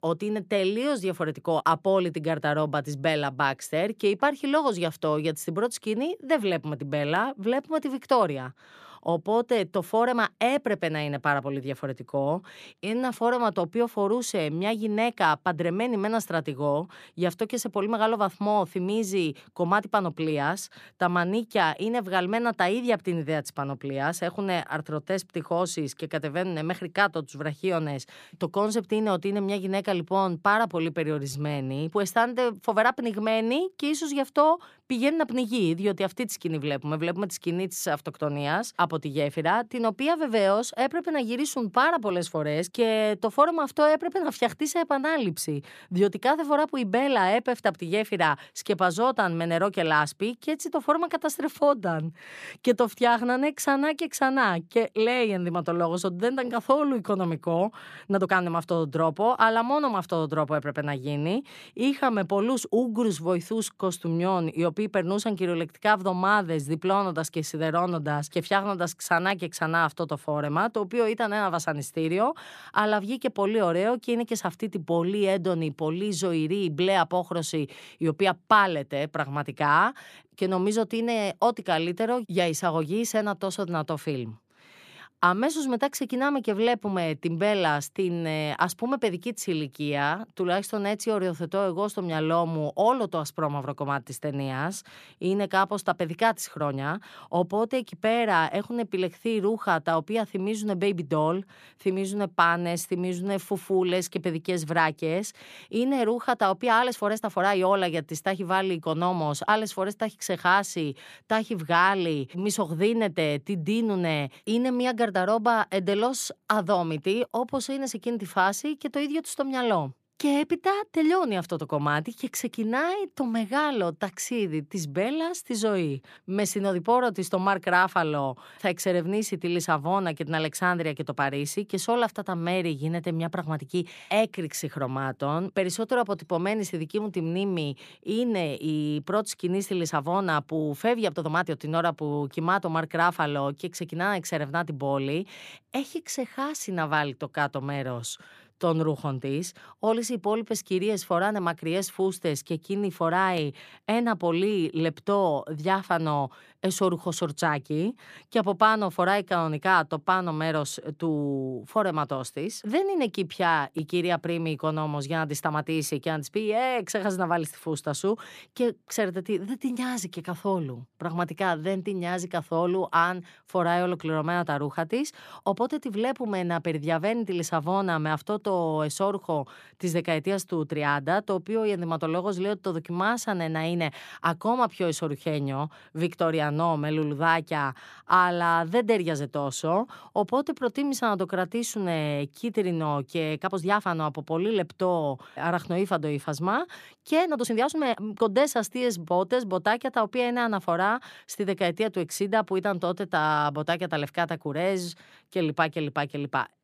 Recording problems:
uneven, jittery; strongly; from 1.5 s to 3:18

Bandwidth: 14.5 kHz